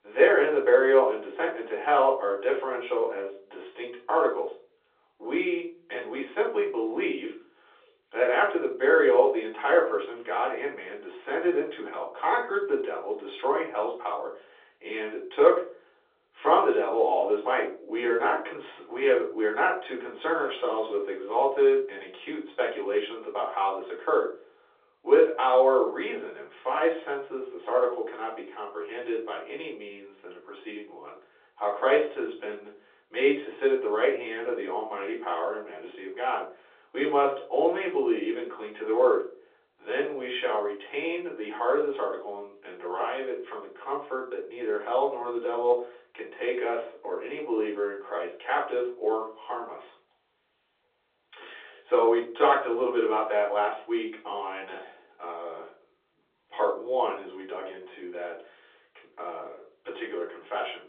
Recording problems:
off-mic speech; far
room echo; slight; dies away in 0.4 s
phone-call audio

